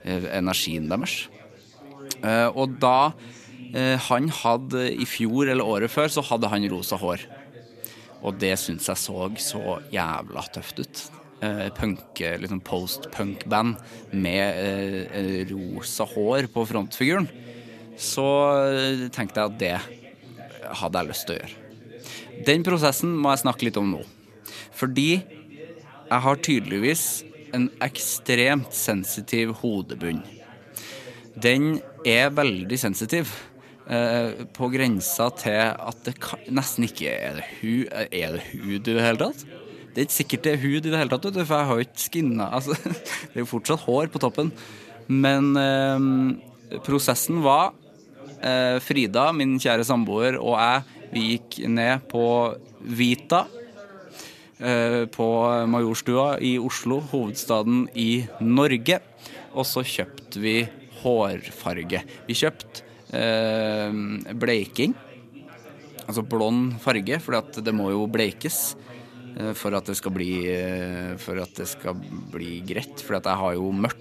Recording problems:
background chatter; faint; throughout; 4 voices, 20 dB below the speech

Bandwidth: 14 kHz